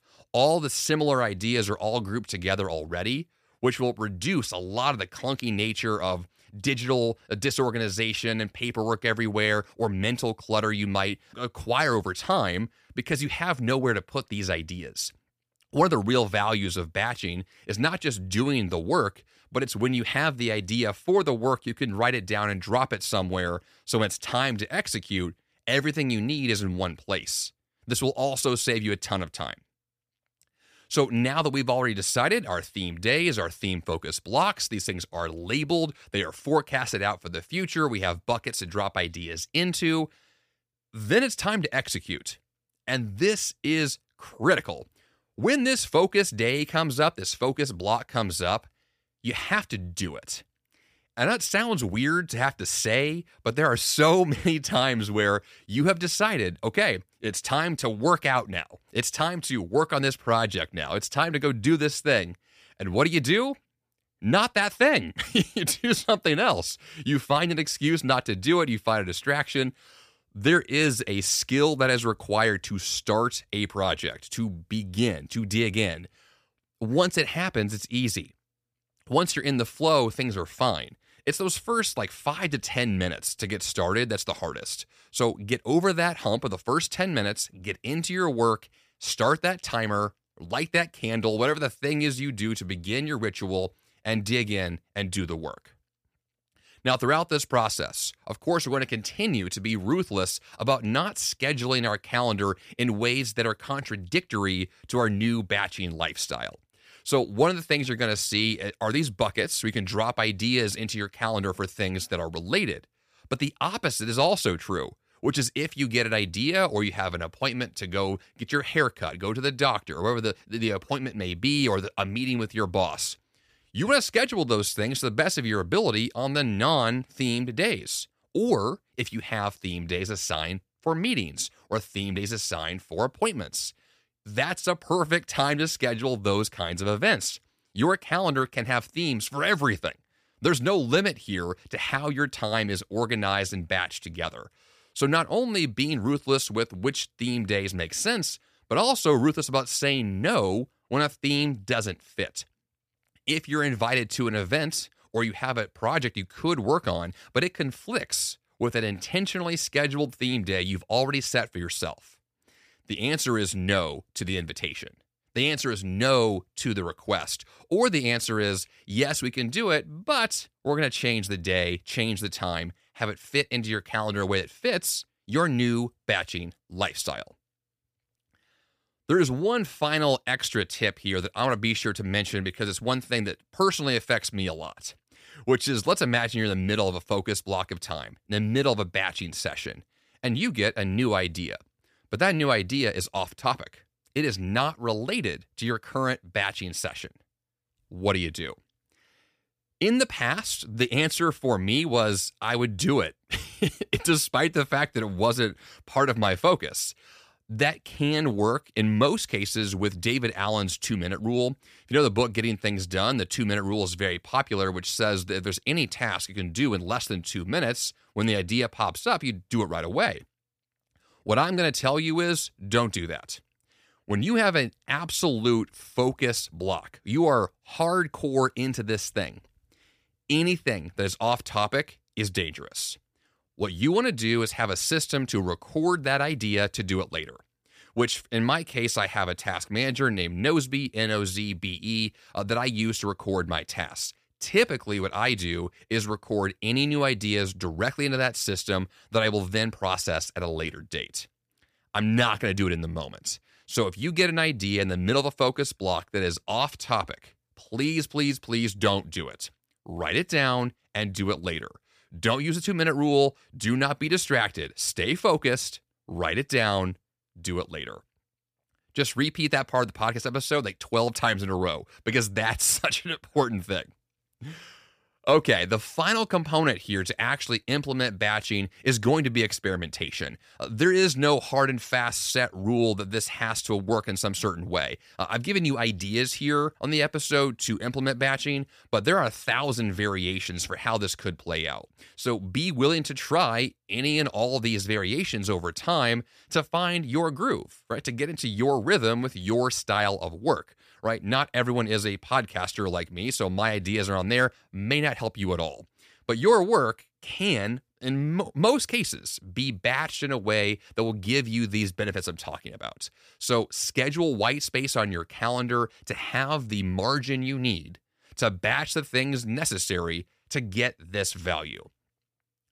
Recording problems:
none

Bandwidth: 15 kHz